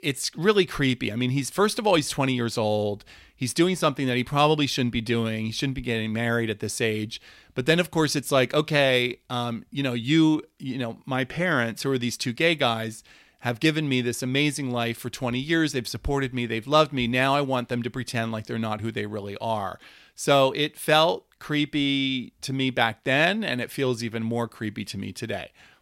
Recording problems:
none

